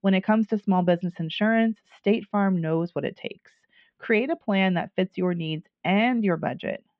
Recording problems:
muffled; very; fading above 3 kHz

